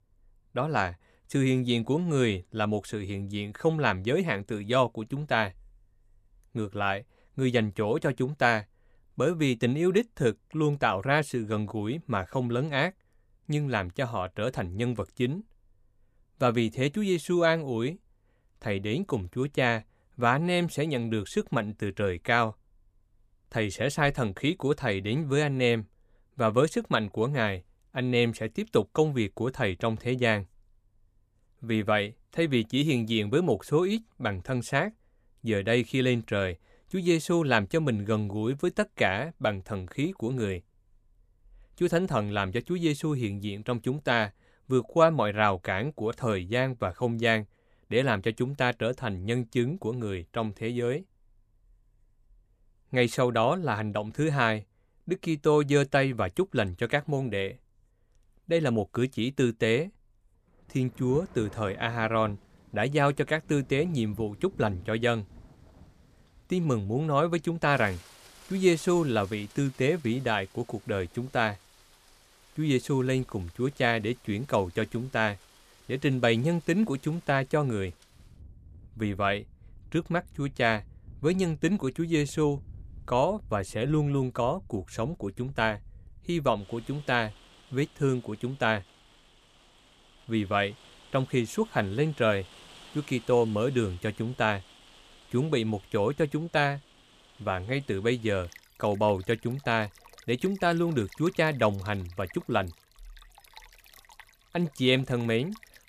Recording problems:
rain or running water; faint; from 1:01 on; 25 dB below the speech

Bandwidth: 14.5 kHz